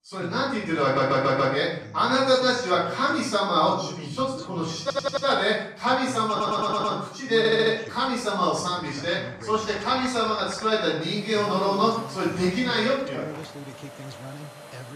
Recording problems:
off-mic speech; far
room echo; noticeable; dies away in 0.6 s
household noises; noticeable; from 8.5 s on; 20 dB below the speech
voice in the background; noticeable; throughout; 15 dB below the speech
audio stuttering; 4 times, first at 1 s

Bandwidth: 14.5 kHz